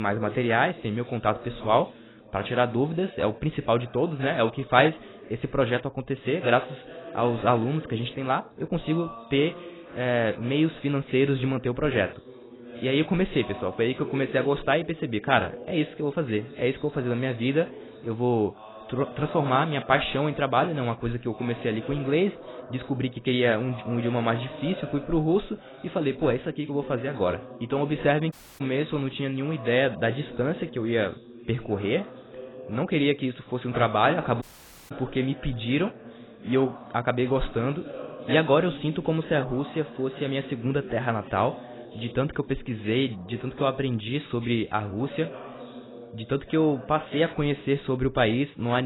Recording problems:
garbled, watery; badly; nothing above 4 kHz
background chatter; noticeable; throughout; 2 voices, 15 dB below the speech
abrupt cut into speech; at the start and the end
audio cutting out; at 28 s and at 34 s

